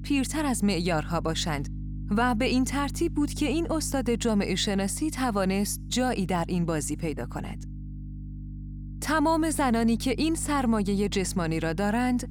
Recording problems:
electrical hum; faint; throughout; 50 Hz, 20 dB below the speech

